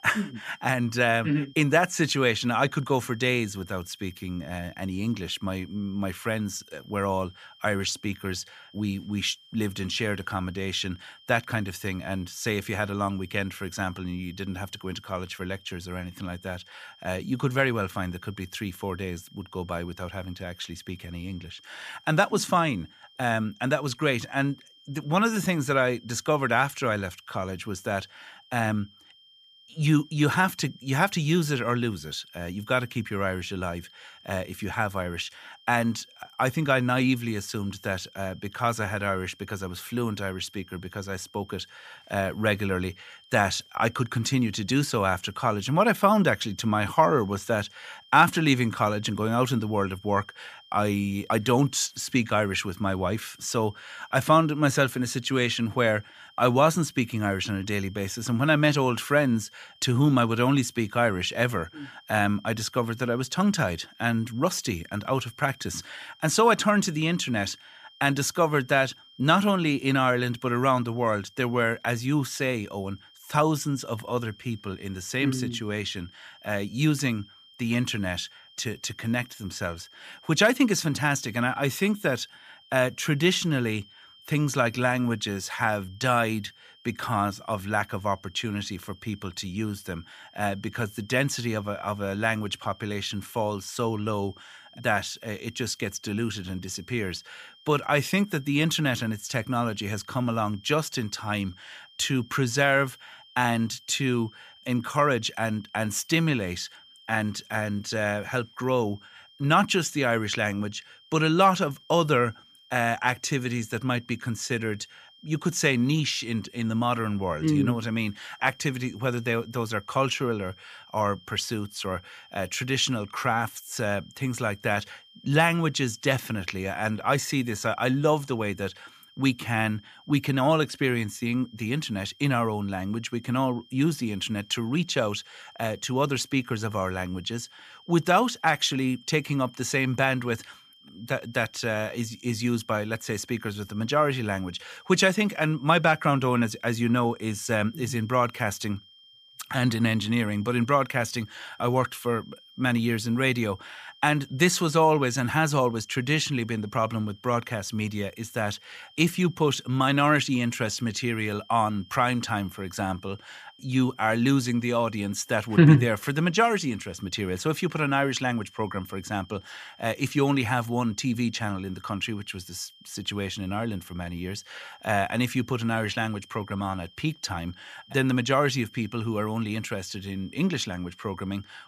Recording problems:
high-pitched whine; faint; throughout; 3 kHz, 25 dB below the speech

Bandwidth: 15 kHz